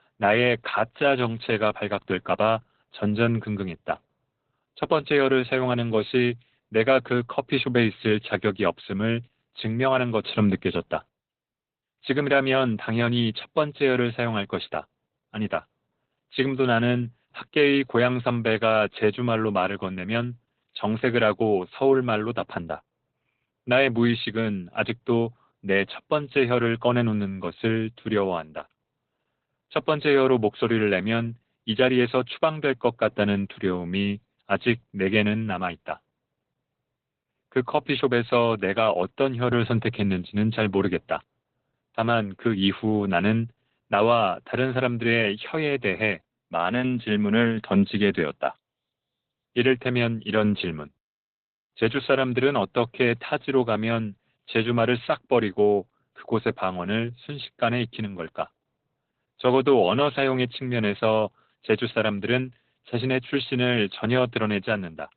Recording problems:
garbled, watery; badly; nothing above 4 kHz

